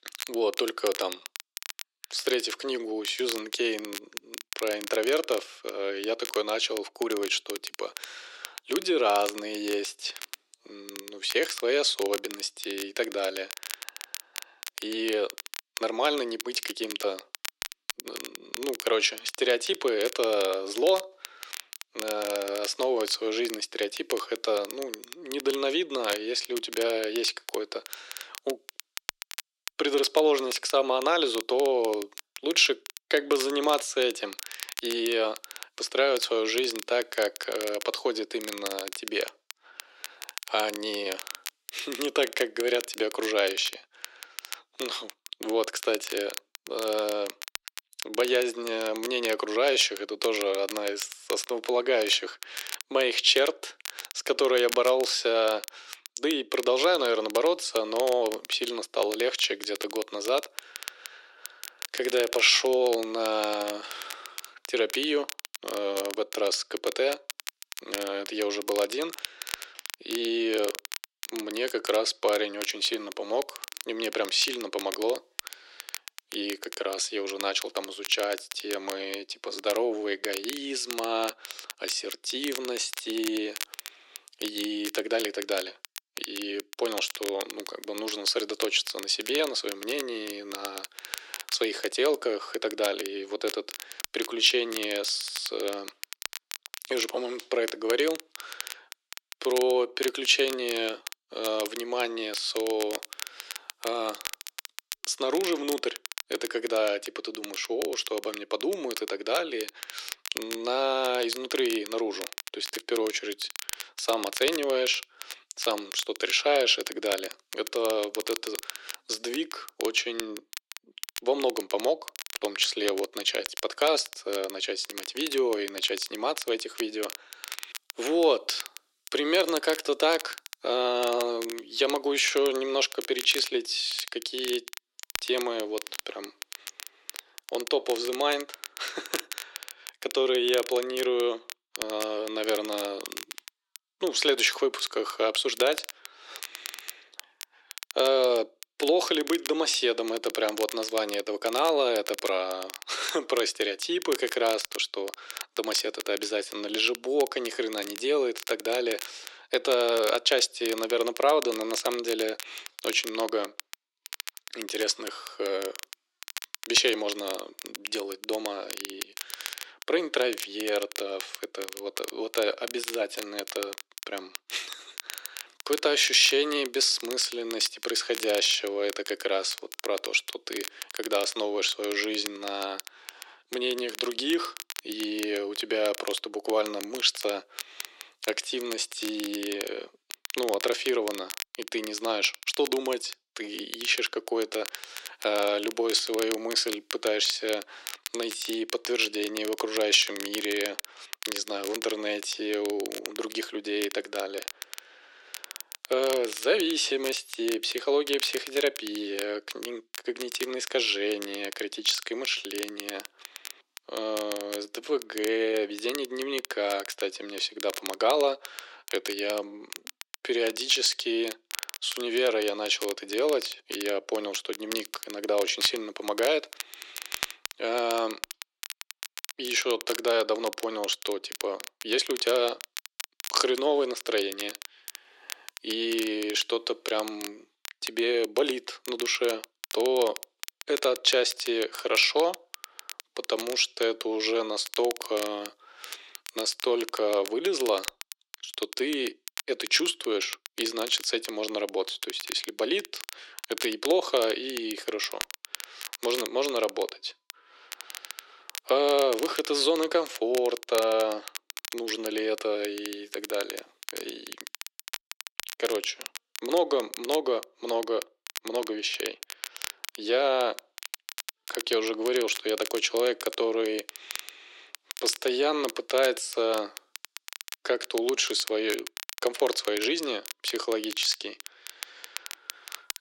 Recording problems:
thin; very; fading below 350 Hz
crackle, like an old record; noticeable; 10 dB below the speech

